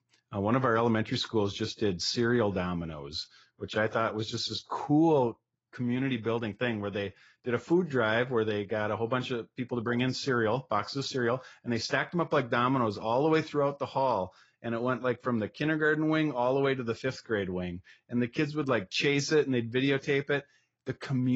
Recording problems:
garbled, watery; badly; nothing above 7 kHz
abrupt cut into speech; at the end

